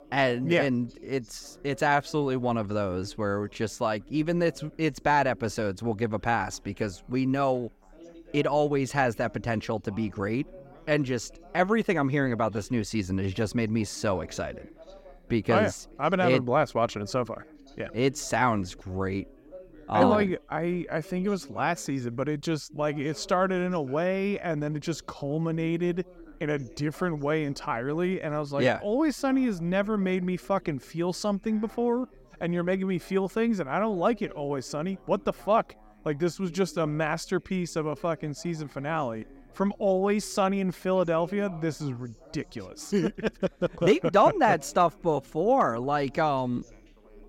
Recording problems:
background chatter; faint; throughout; 4 voices, 25 dB below the speech

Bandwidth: 16 kHz